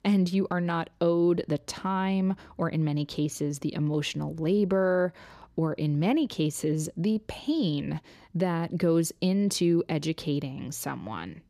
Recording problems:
none

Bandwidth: 14.5 kHz